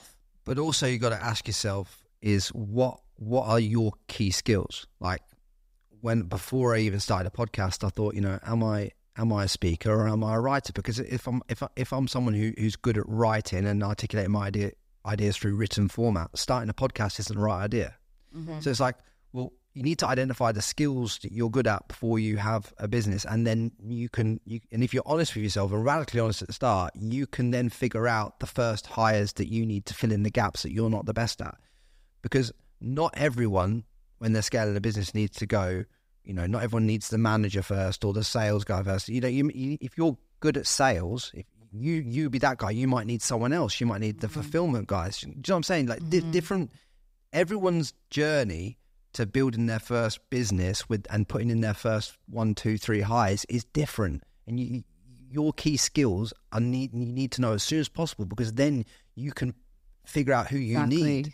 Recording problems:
none

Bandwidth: 15.5 kHz